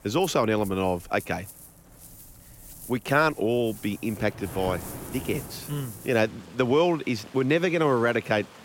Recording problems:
rain or running water; noticeable; throughout; 15 dB below the speech

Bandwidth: 16.5 kHz